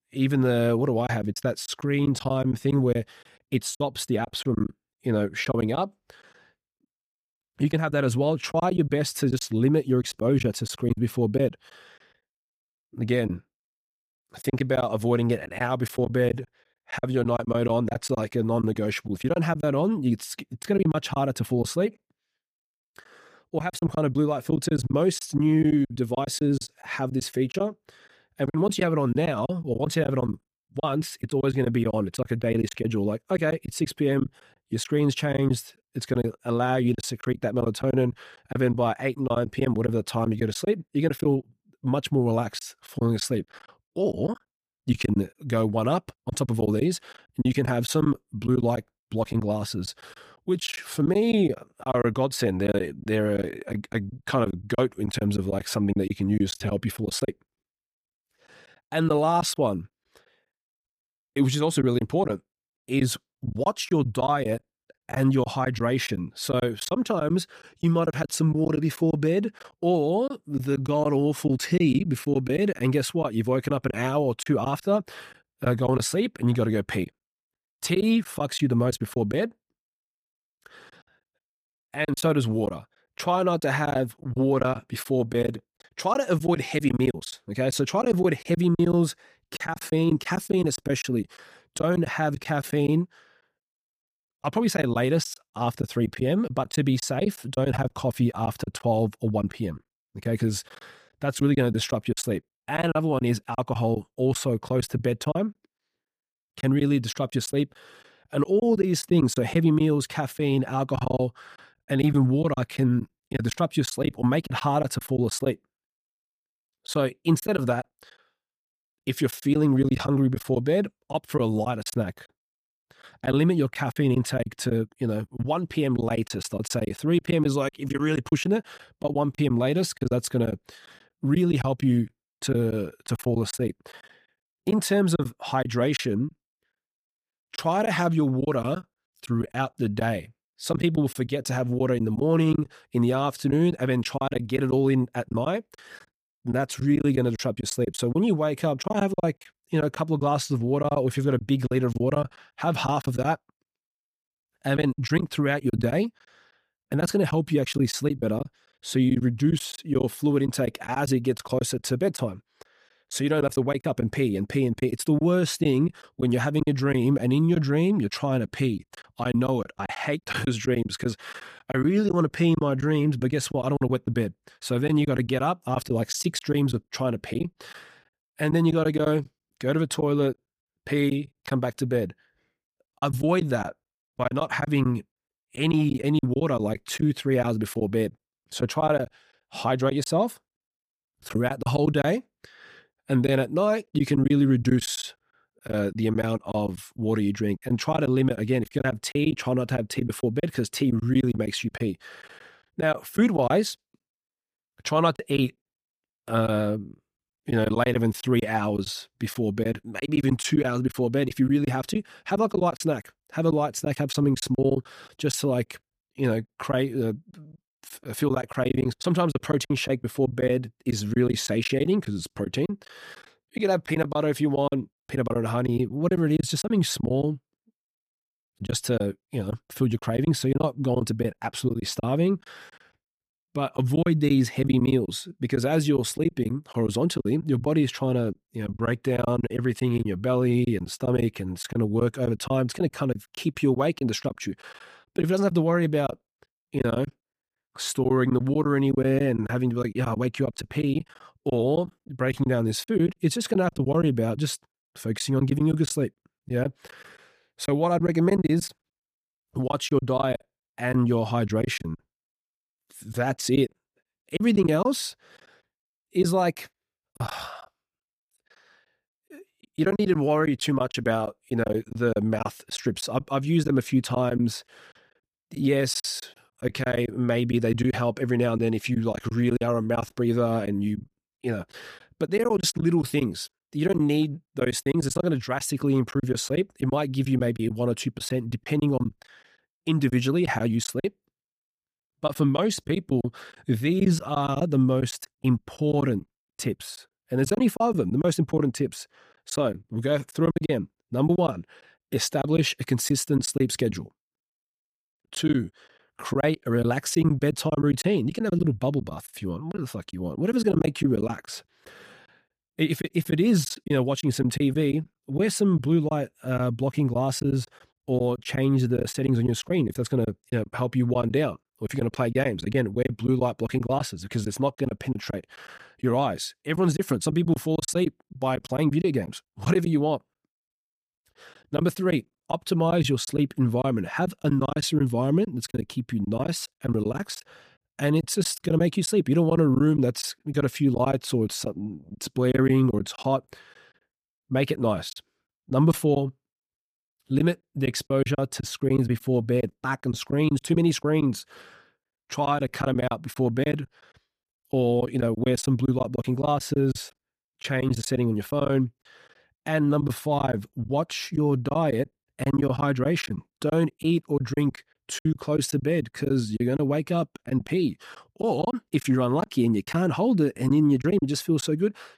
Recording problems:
choppy; very; 8% of the speech affected

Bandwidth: 15 kHz